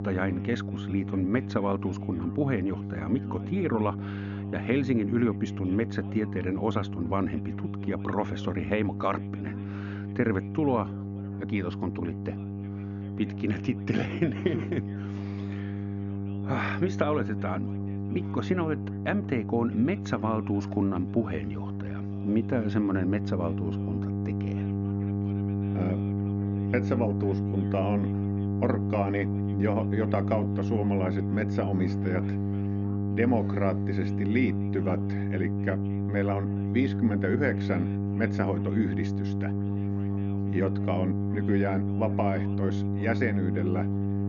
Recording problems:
high frequencies cut off; noticeable; nothing above 7 kHz
muffled; very slightly; fading above 4 kHz
electrical hum; loud; throughout; 50 Hz, 6 dB below the speech
background chatter; faint; throughout; 2 voices, 25 dB below the speech

